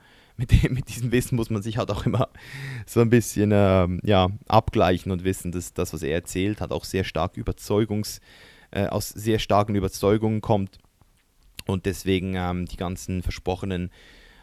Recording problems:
none

